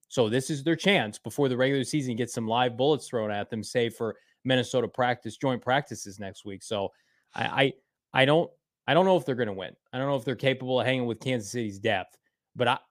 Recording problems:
none

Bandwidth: 15 kHz